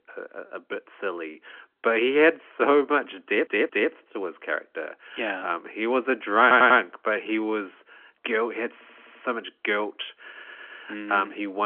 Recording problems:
phone-call audio; nothing above 3.5 kHz
uneven, jittery; slightly; from 0.5 to 7.5 s
audio stuttering; 4 times, first at 3.5 s
abrupt cut into speech; at the end

